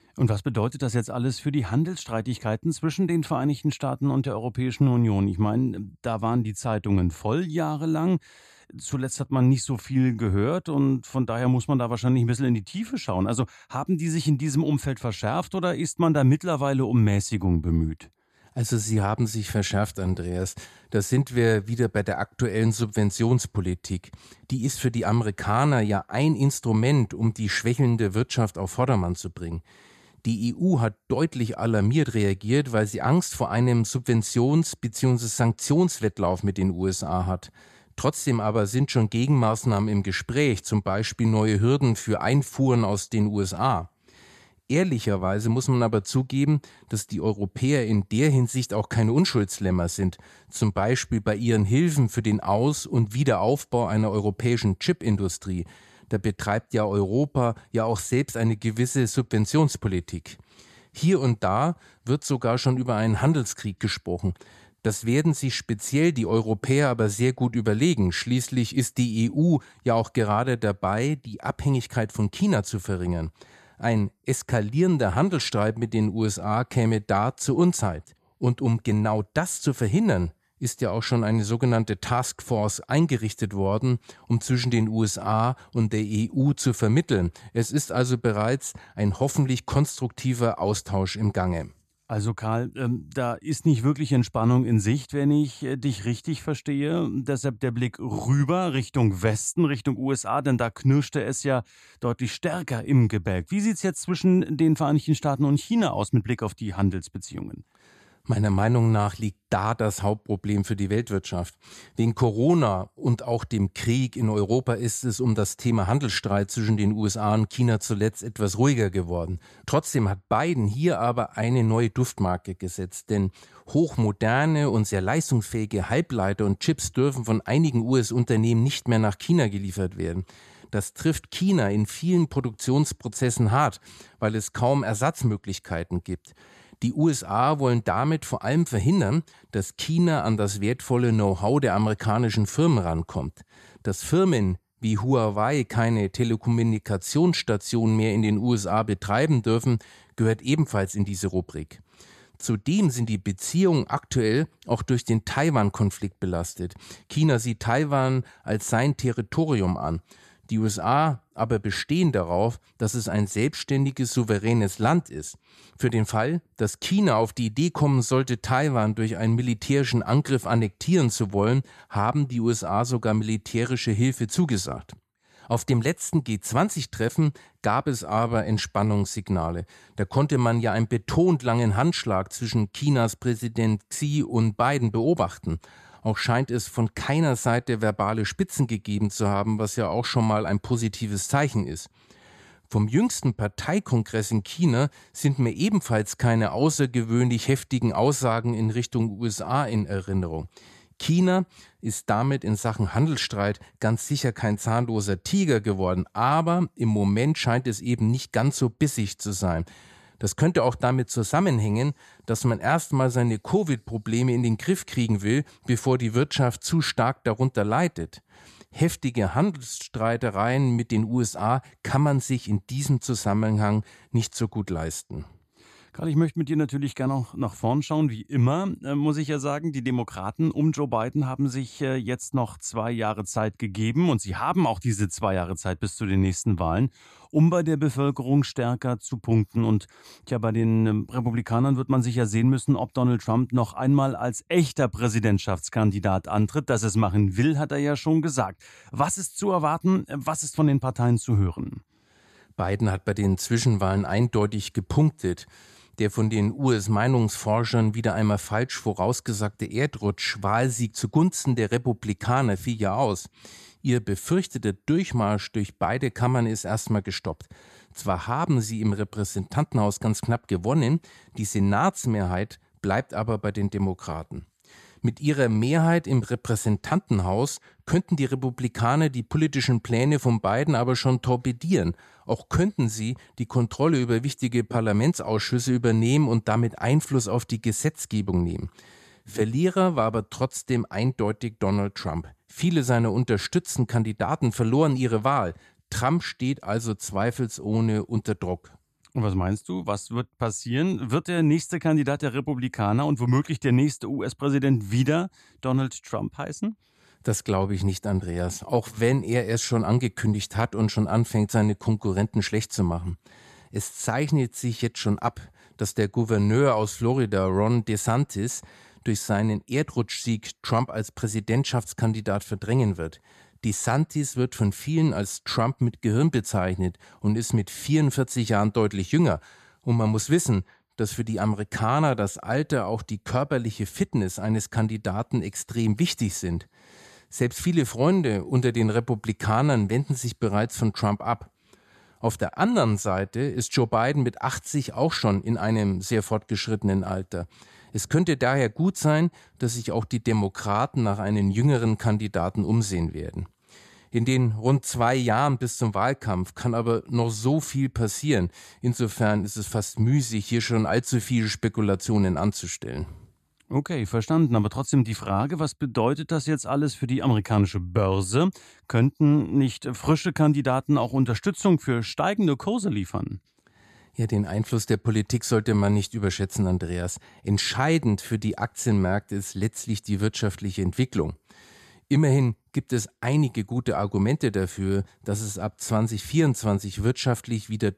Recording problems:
none

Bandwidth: 14 kHz